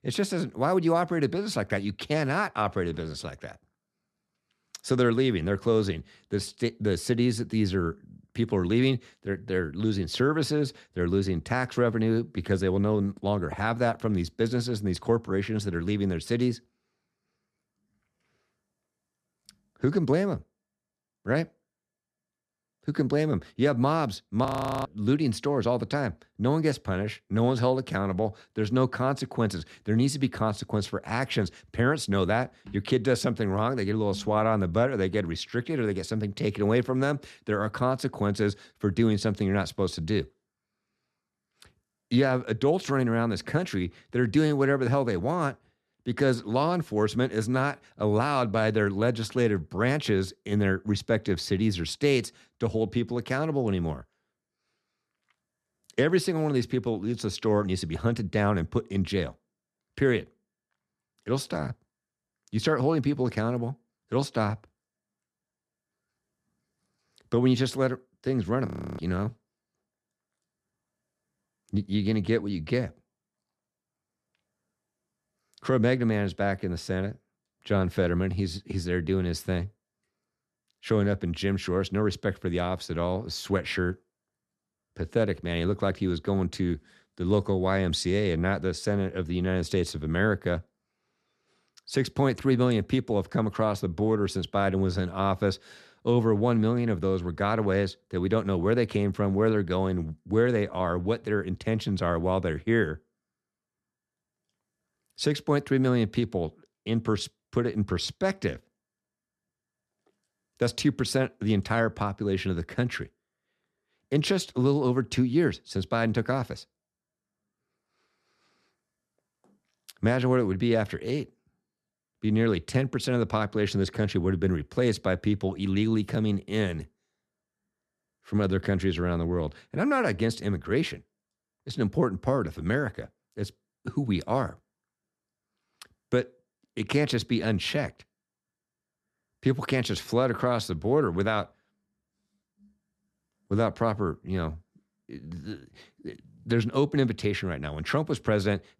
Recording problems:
audio freezing; at 24 s and at 1:09

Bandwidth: 13.5 kHz